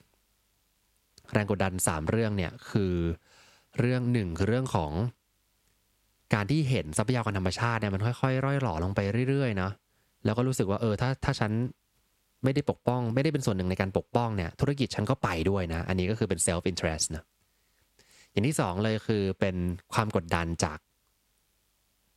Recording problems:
squashed, flat; somewhat

